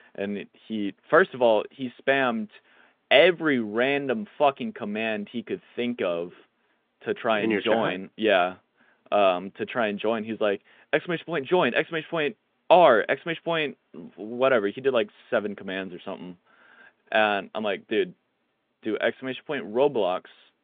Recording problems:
phone-call audio; nothing above 3.5 kHz

